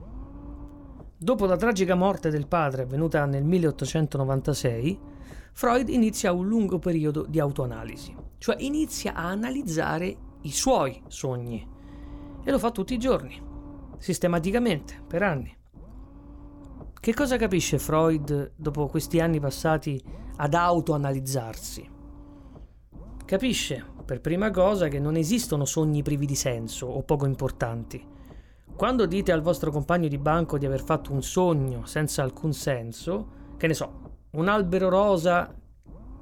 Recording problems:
low rumble; faint; throughout; 25 dB below the speech

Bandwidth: 18 kHz